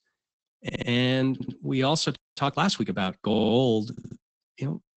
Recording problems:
garbled, watery; badly; nothing above 8 kHz
audio stuttering; 4 times, first at 0.5 s
audio freezing; at 2 s

